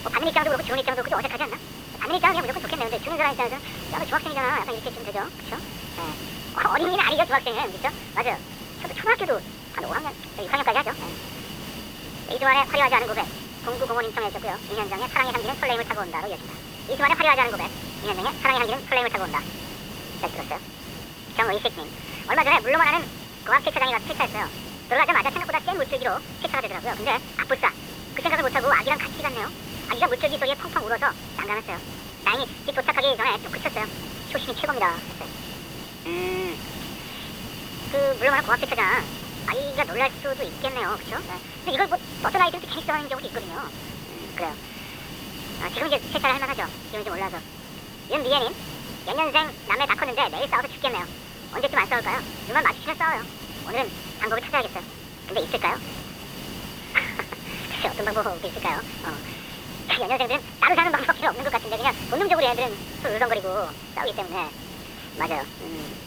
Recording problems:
thin; very; fading below 500 Hz
high frequencies cut off; severe; nothing above 4 kHz
wrong speed and pitch; too fast and too high; 1.7 times normal speed
hiss; noticeable; throughout; 10 dB below the speech

